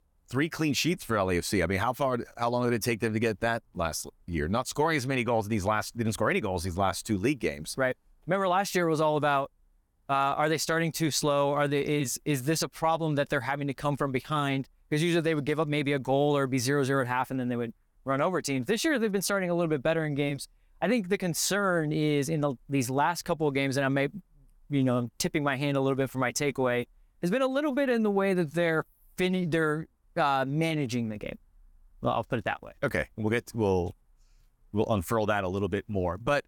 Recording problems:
none

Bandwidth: 18 kHz